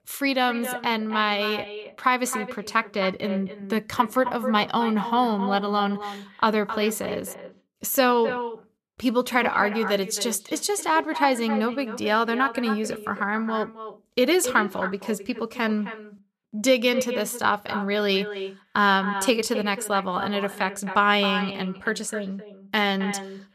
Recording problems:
echo of what is said; strong; throughout; 260 ms later, 10 dB below the speech

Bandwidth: 14 kHz